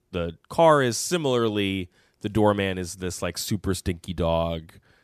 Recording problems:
none

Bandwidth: 14 kHz